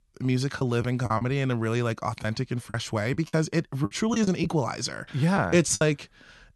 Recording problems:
choppy; very; at 0.5 s and from 2 to 6 s; 9% of the speech affected

